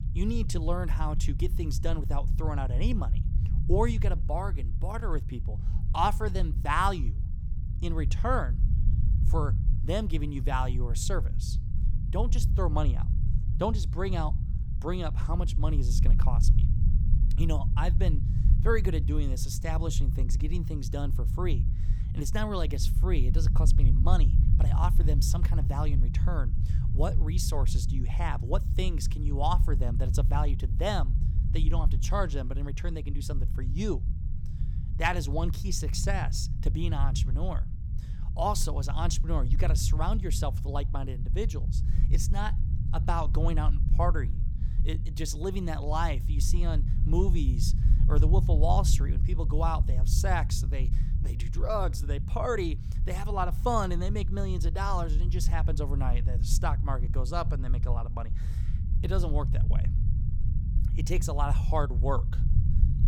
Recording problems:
low rumble; noticeable; throughout; 10 dB below the speech

